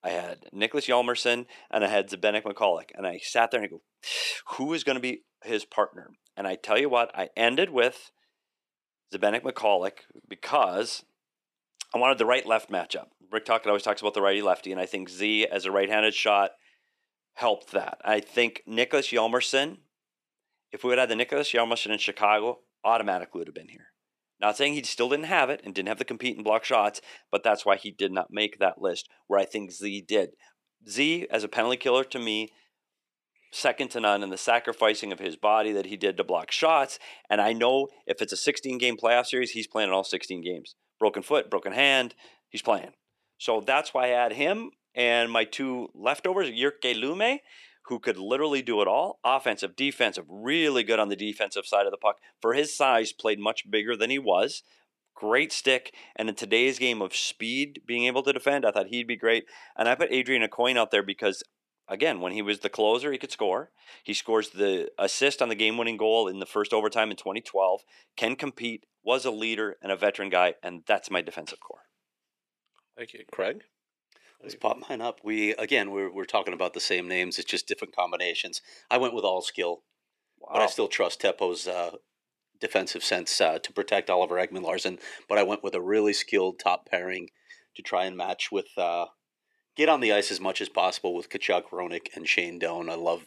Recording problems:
thin; somewhat; fading below 300 Hz

